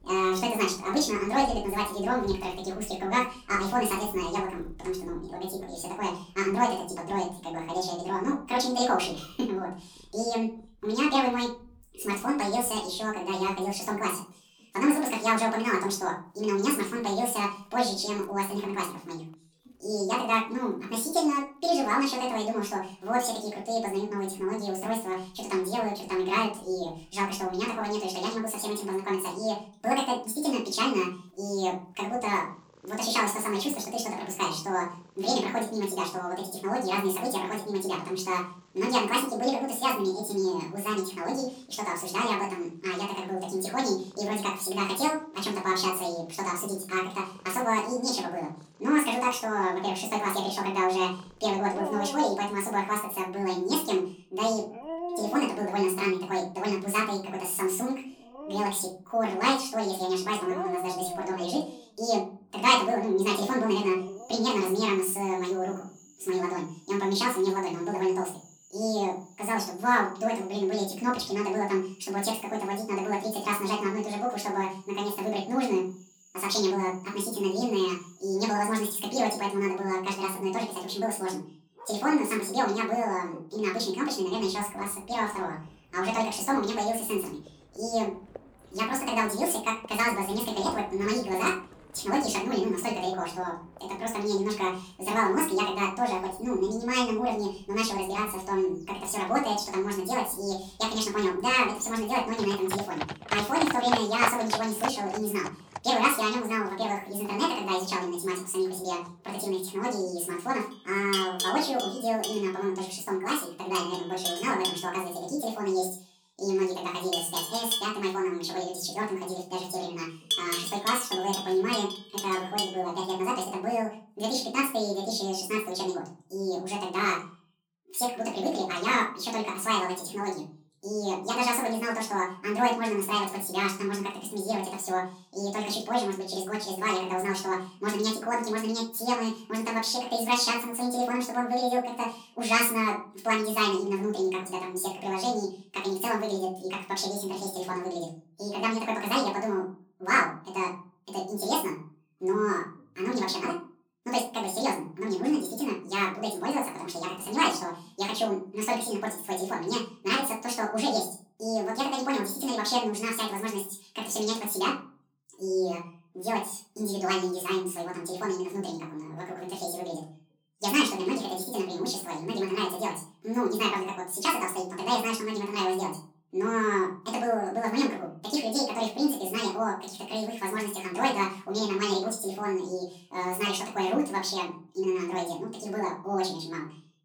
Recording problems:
off-mic speech; far
wrong speed and pitch; too fast and too high; 1.7 times normal speed
room echo; slight; dies away in 0.4 s
animal sounds; loud; until 2:03; 8 dB below the speech

